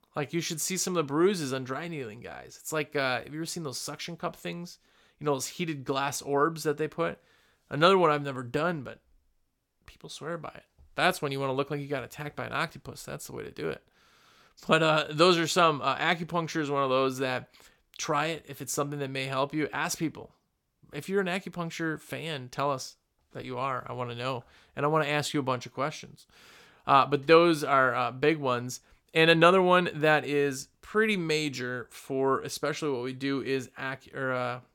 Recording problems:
none

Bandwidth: 17 kHz